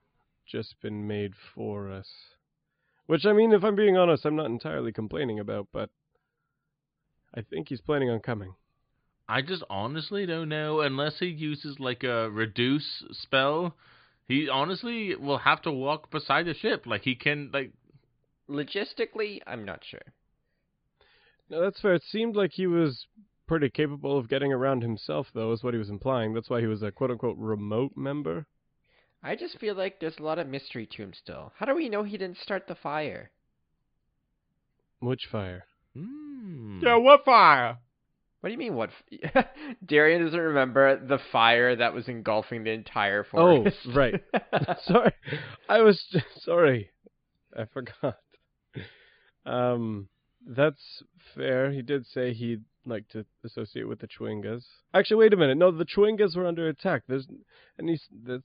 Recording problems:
high frequencies cut off; severe; nothing above 5 kHz

